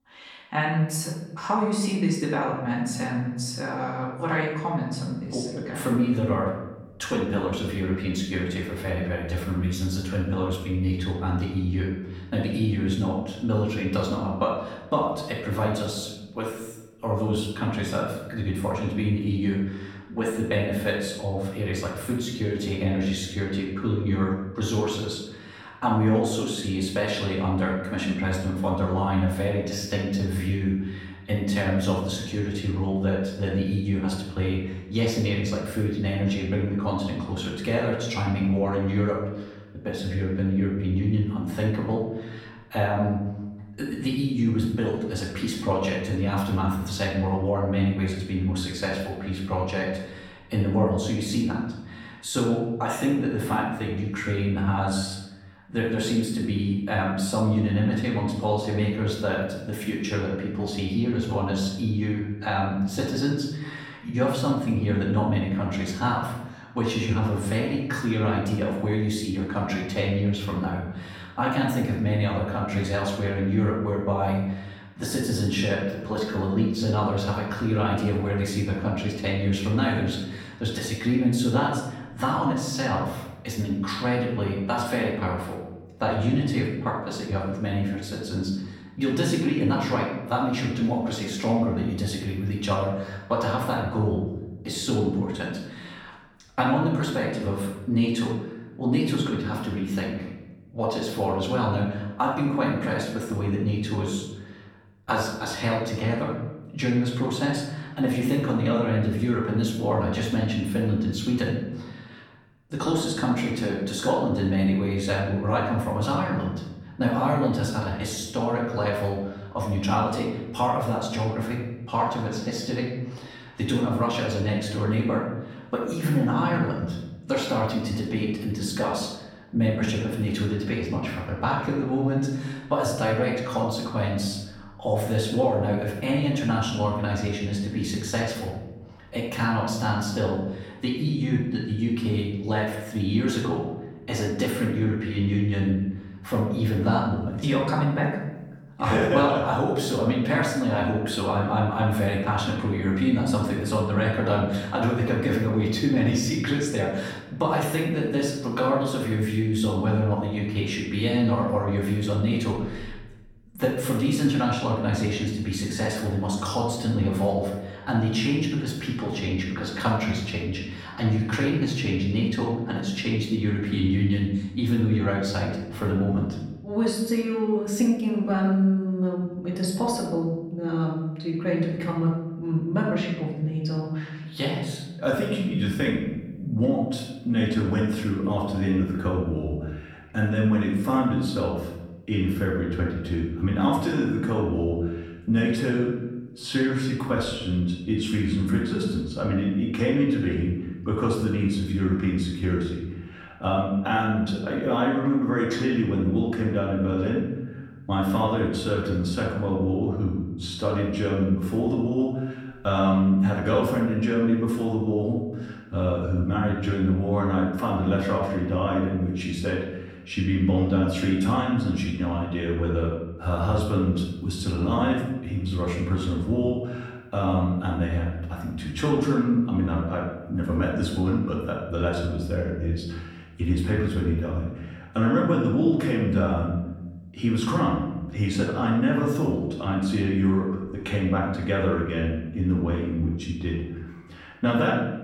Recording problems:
off-mic speech; far
room echo; noticeable; dies away in 0.9 s

